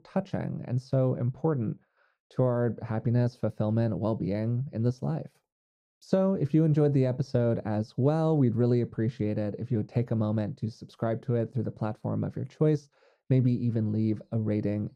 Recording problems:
muffled; very; fading above 1 kHz

